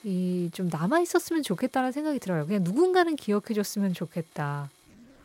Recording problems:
household noises; faint; throughout; 30 dB below the speech

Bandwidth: 16 kHz